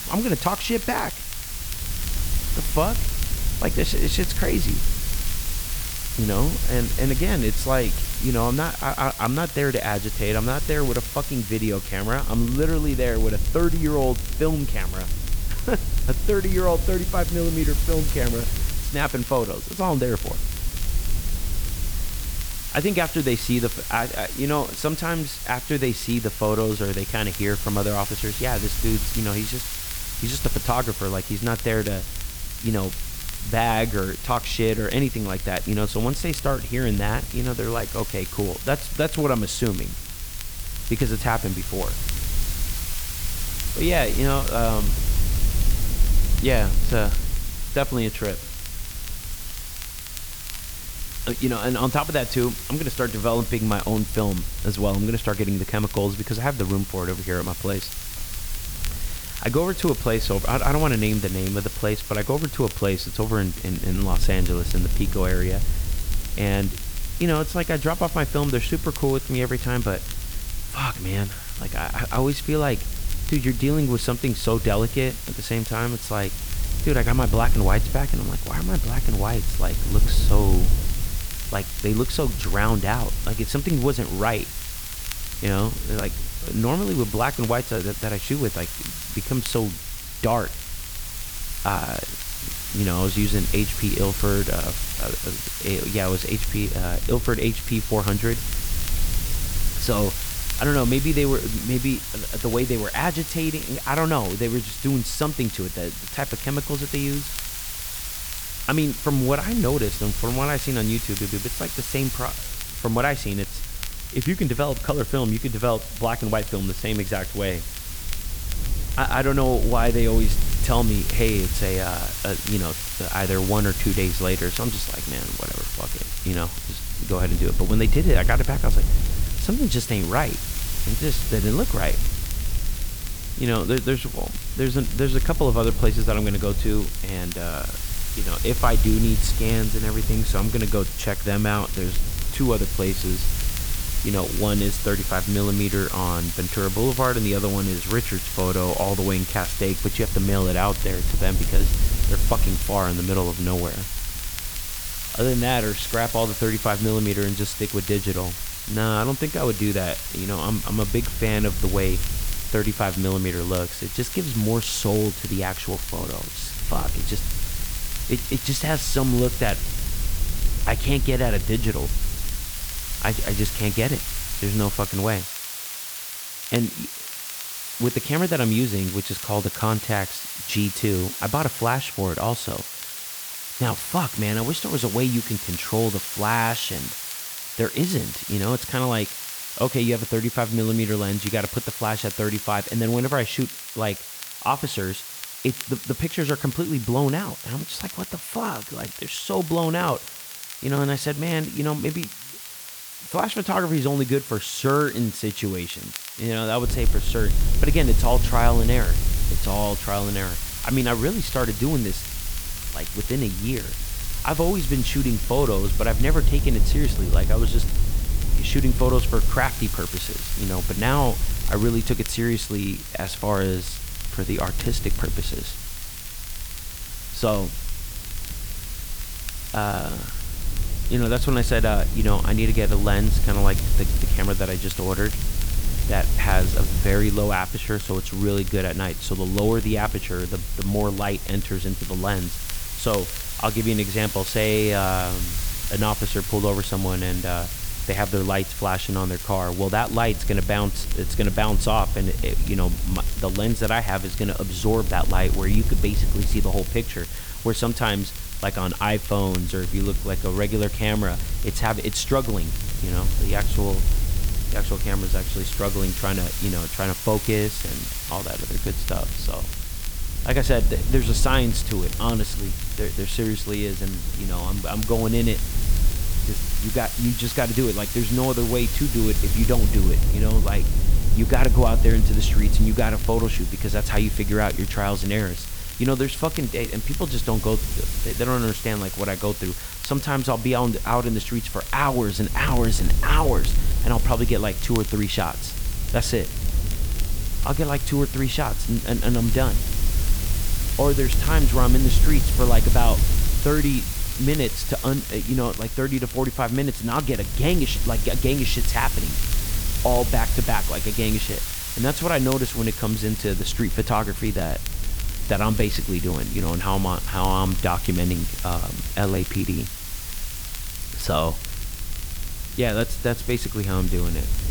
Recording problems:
hiss; loud; throughout; 6 dB below the speech
low rumble; noticeable; until 2:55 and from 3:27 on; 20 dB below the speech
crackle, like an old record; noticeable; 20 dB below the speech
audio stuttering; at 1:51

